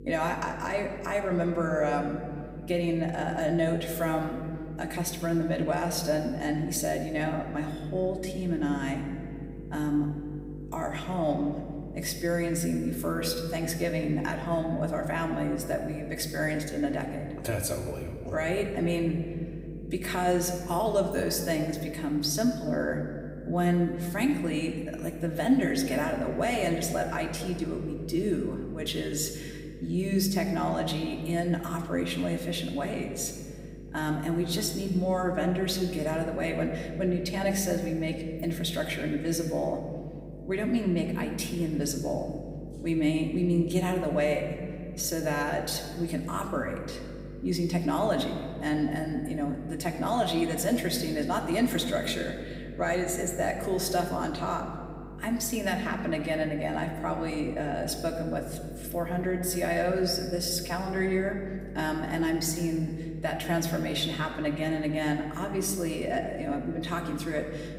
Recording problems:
room echo; slight; dies away in 1.8 s
off-mic speech; somewhat distant
electrical hum; noticeable; throughout; 50 Hz, 20 dB below the speech

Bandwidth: 15.5 kHz